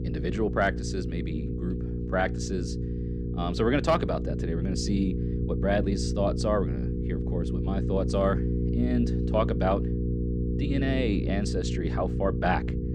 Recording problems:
electrical hum; loud; throughout; 60 Hz, 8 dB below the speech
low rumble; faint; throughout; 25 dB below the speech

